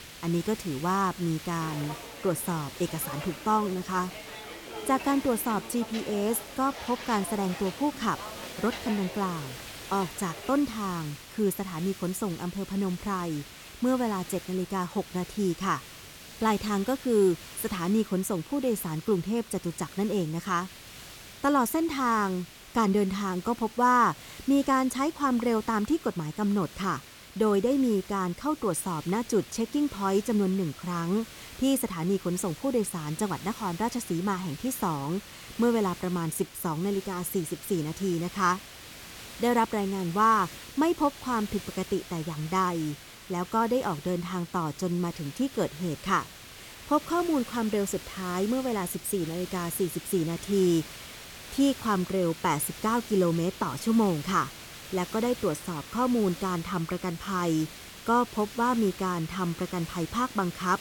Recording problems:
hiss; noticeable; throughout; 15 dB below the speech
footsteps; noticeable; from 1.5 to 11 s; peak 9 dB below the speech

